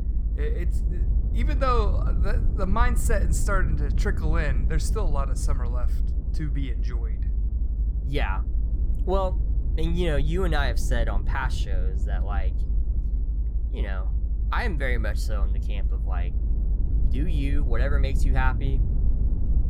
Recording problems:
low rumble; noticeable; throughout; 15 dB below the speech

